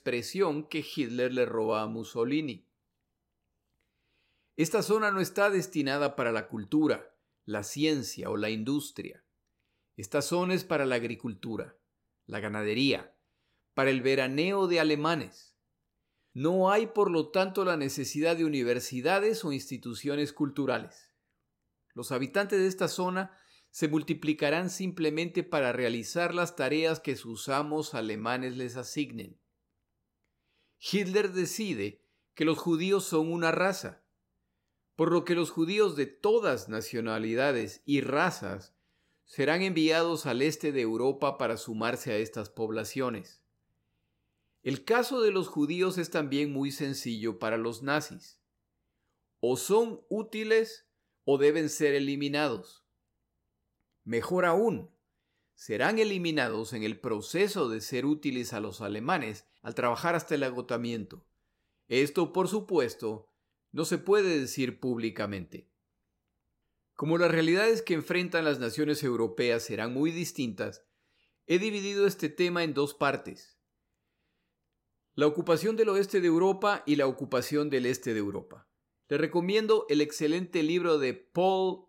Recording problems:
none

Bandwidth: 16 kHz